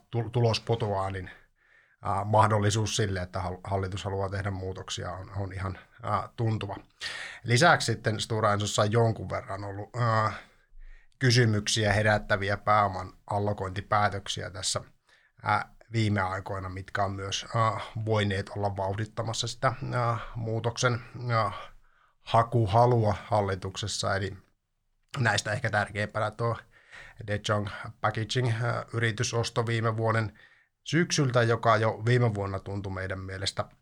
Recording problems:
none

